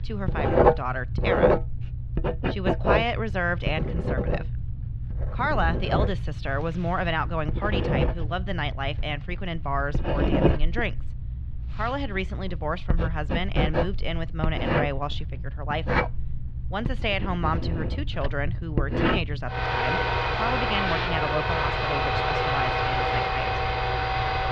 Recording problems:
muffled; very slightly; fading above 4 kHz
household noises; very loud; throughout; 4 dB above the speech
low rumble; noticeable; throughout; 20 dB below the speech

